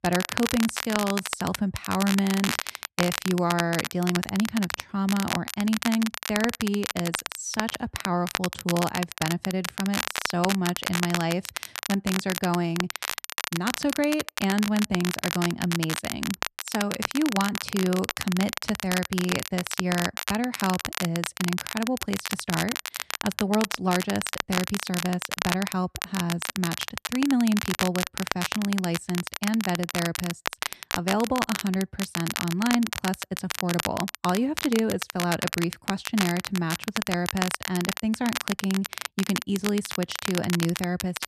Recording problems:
crackle, like an old record; loud; 3 dB below the speech

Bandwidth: 14 kHz